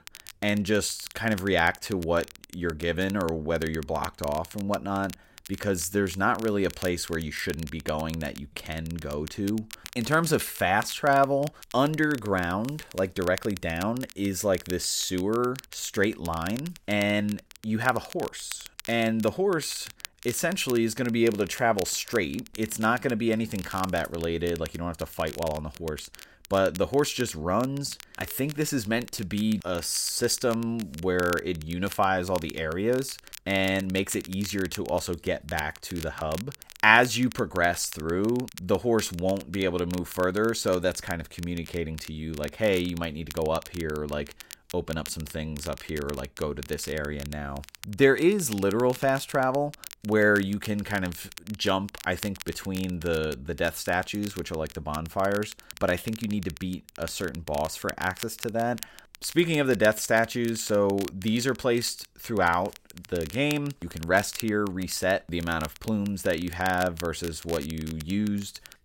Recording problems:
crackle, like an old record; noticeable; 15 dB below the speech

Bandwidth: 16 kHz